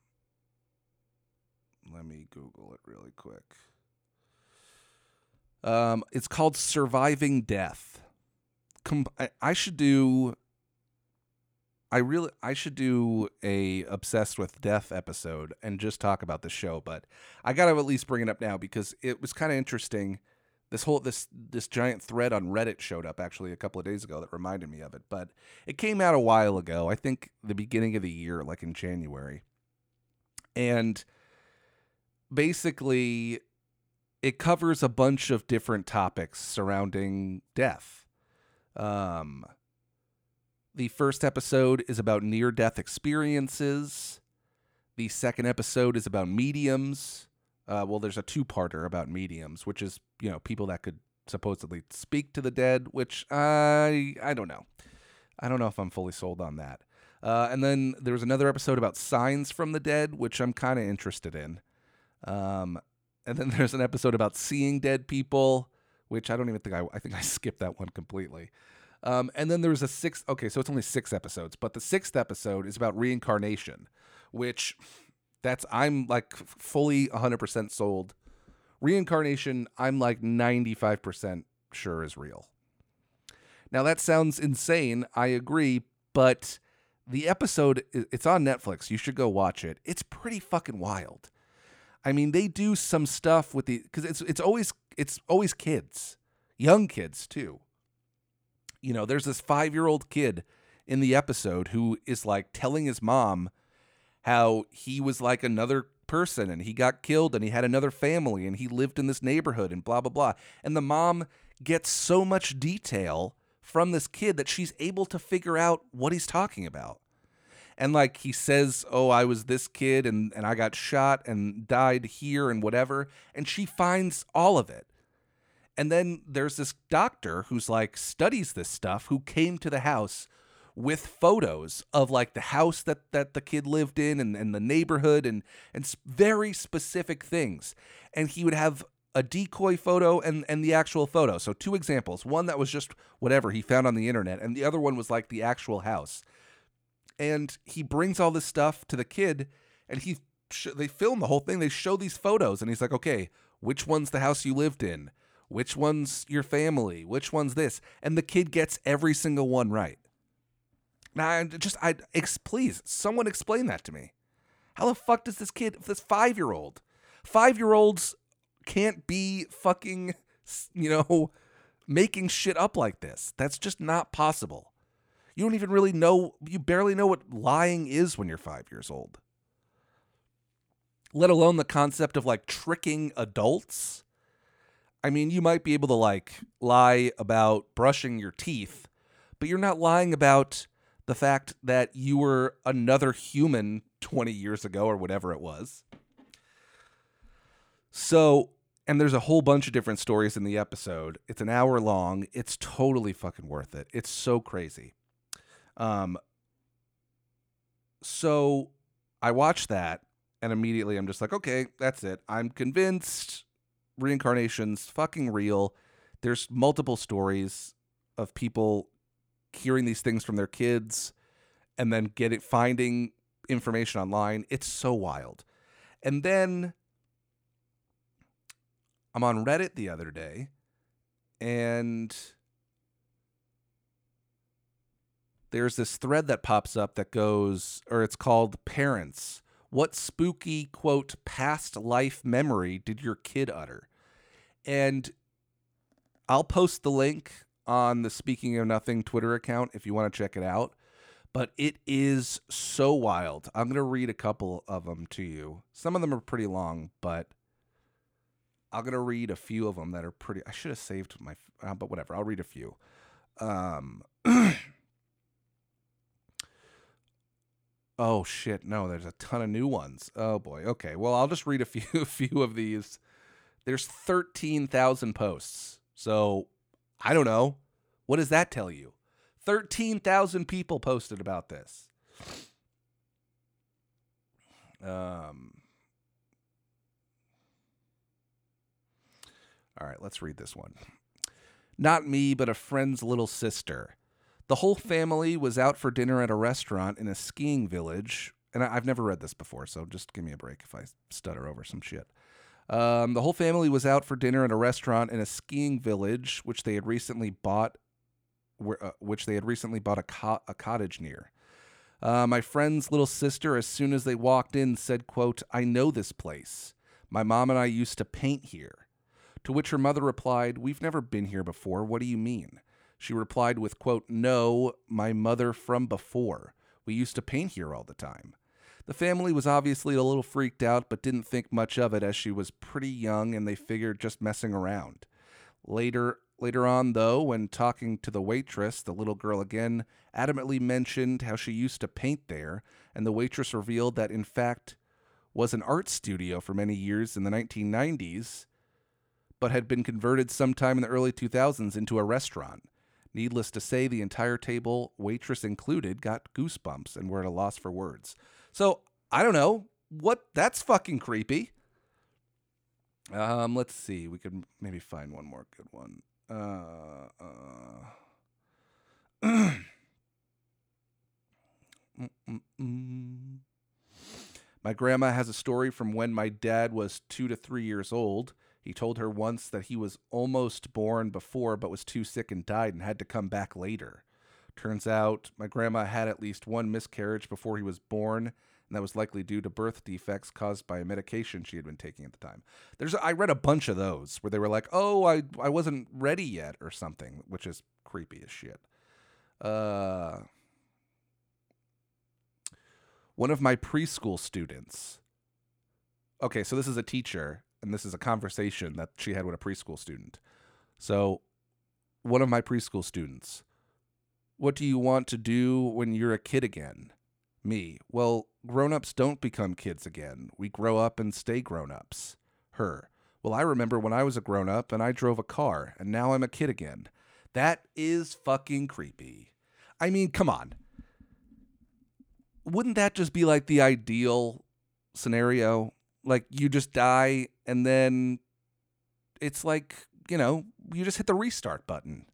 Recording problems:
none

